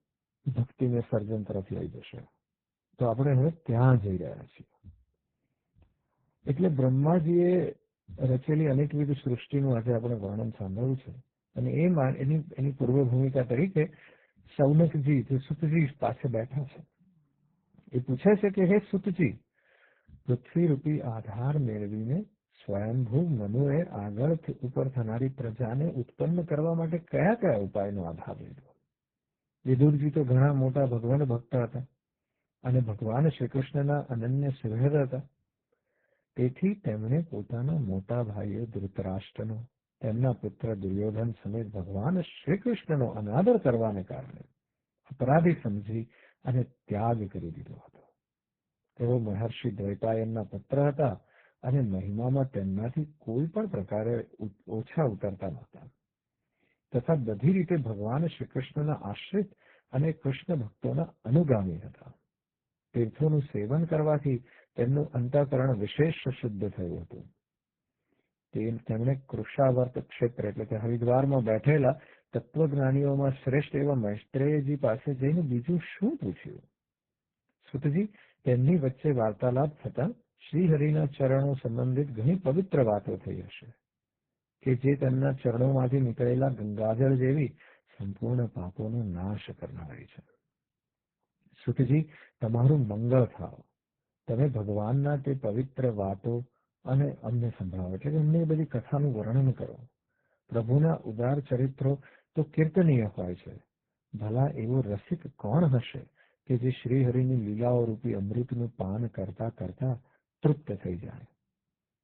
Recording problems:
garbled, watery; badly; nothing above 3.5 kHz
muffled; very slightly; fading above 2.5 kHz

